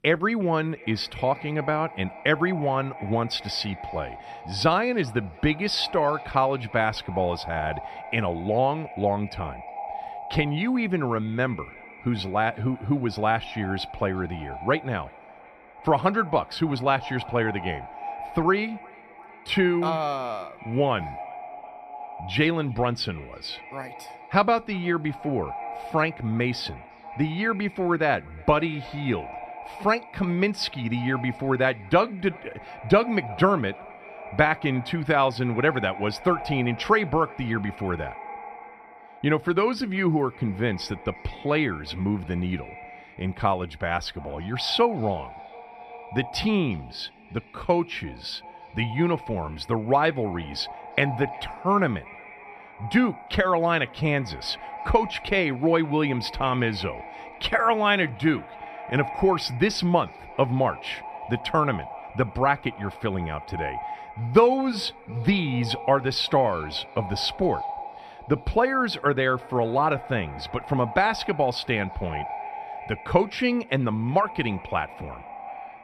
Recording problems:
echo of what is said; noticeable; throughout; 360 ms later, 15 dB below the speech

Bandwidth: 14.5 kHz